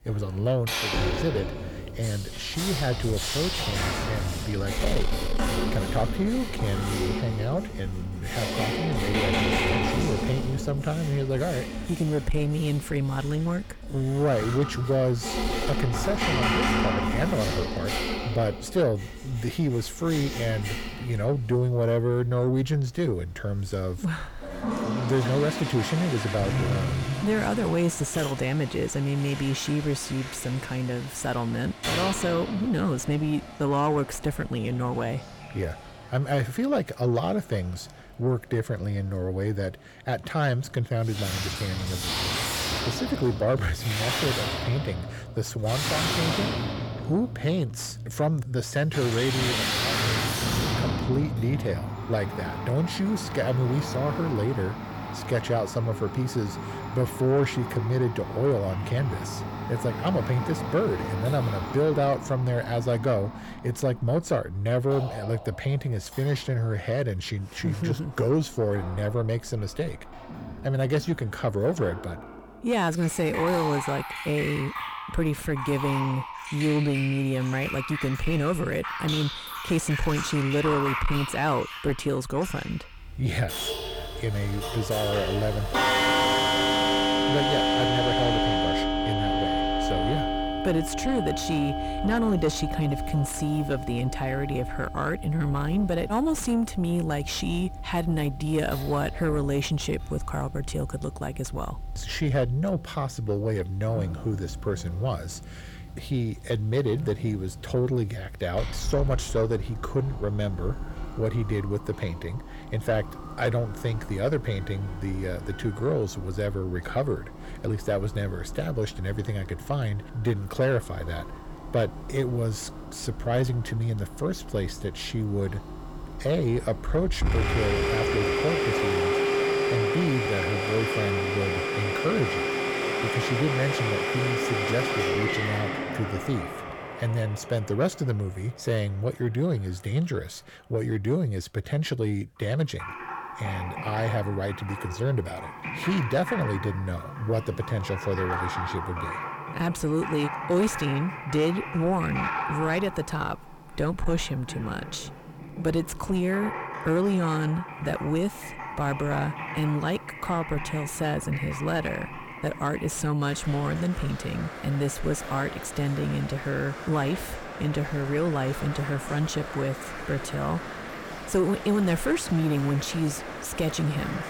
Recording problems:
distortion; heavy; 7 dB below the speech
household noises; loud; throughout; 3 dB below the speech

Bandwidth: 17.5 kHz